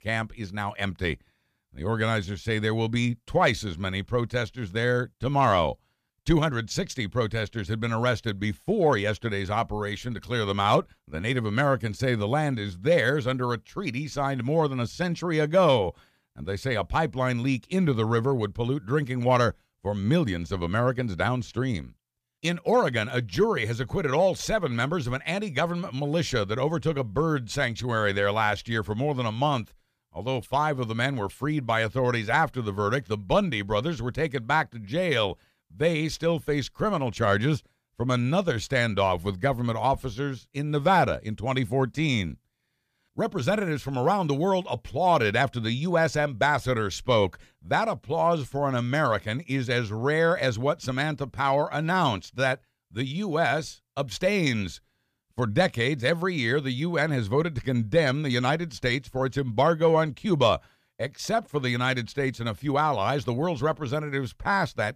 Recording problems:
none

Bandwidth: 15 kHz